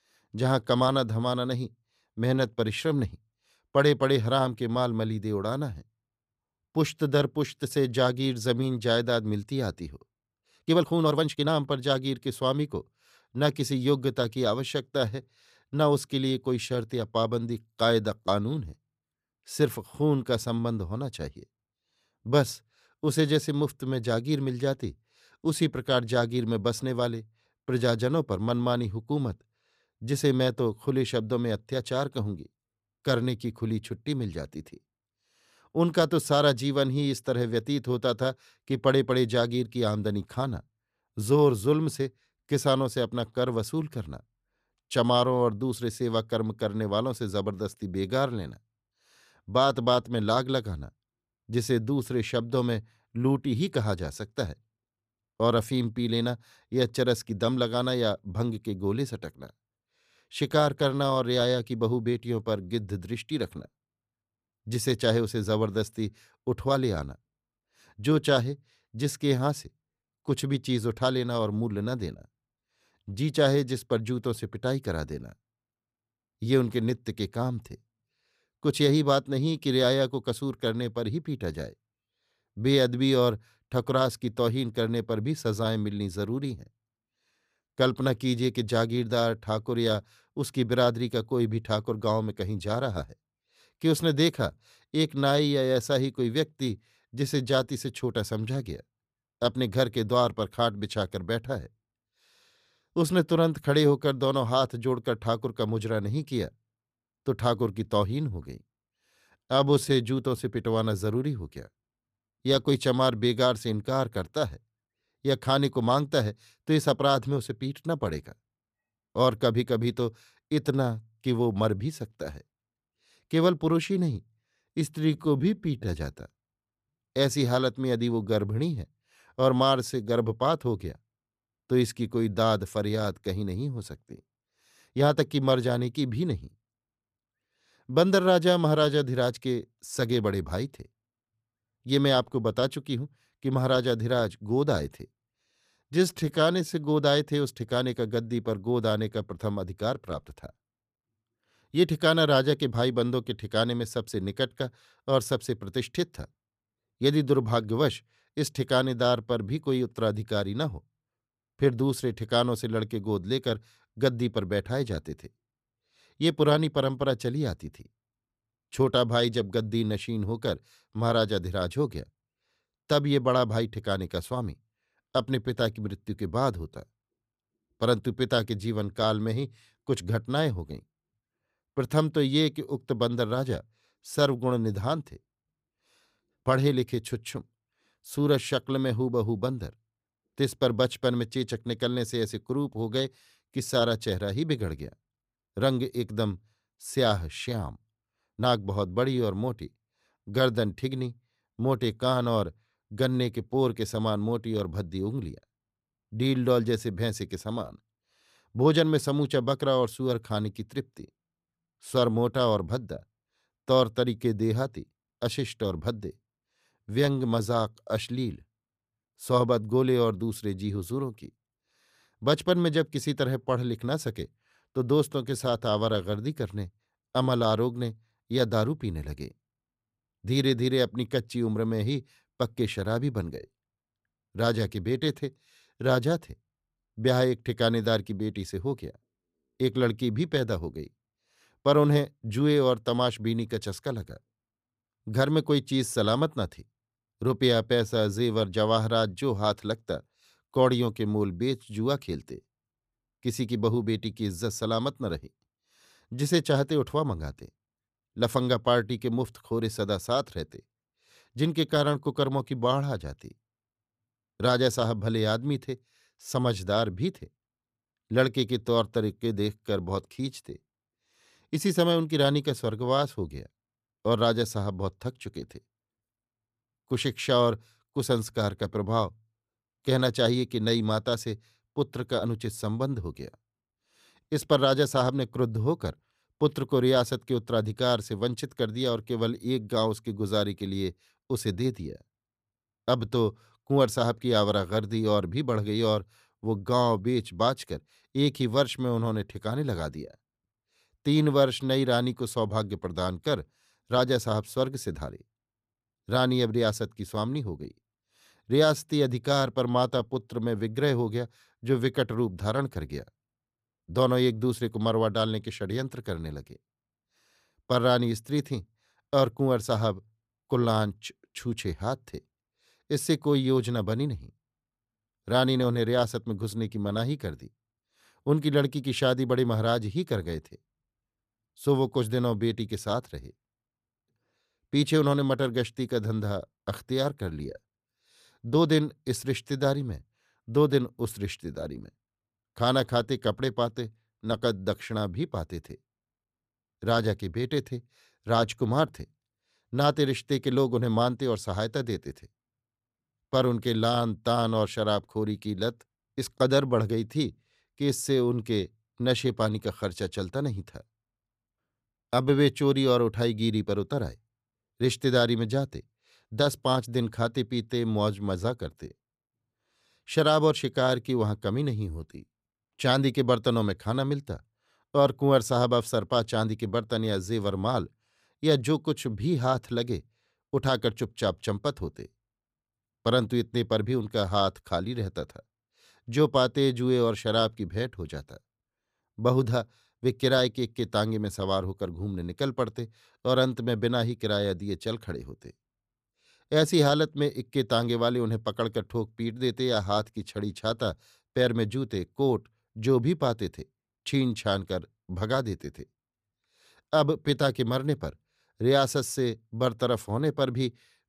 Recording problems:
uneven, jittery; strongly; from 10 s to 3:19

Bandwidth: 14.5 kHz